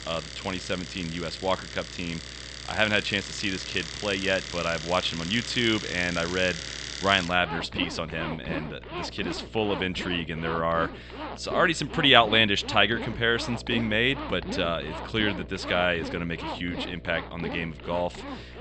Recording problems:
high frequencies cut off; noticeable; nothing above 8 kHz
household noises; noticeable; throughout; 10 dB below the speech
electrical hum; faint; throughout; 60 Hz, 25 dB below the speech

